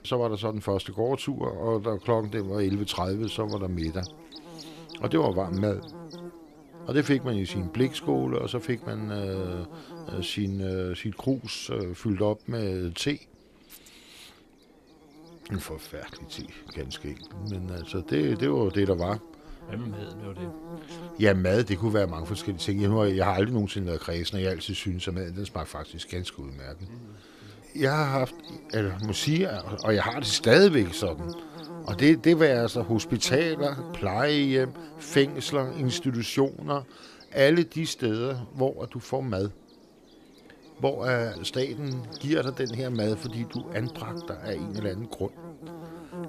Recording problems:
electrical hum; noticeable; throughout; 50 Hz, 15 dB below the speech

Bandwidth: 14.5 kHz